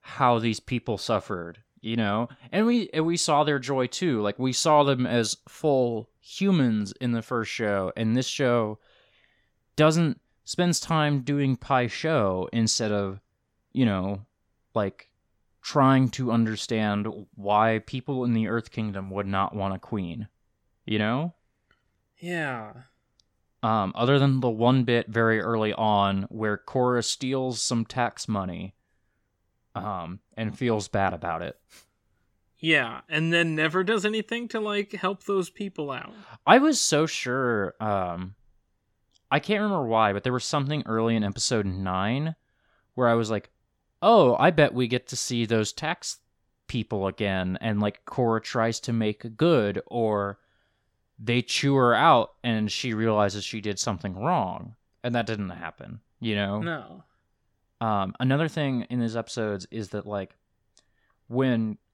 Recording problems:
none

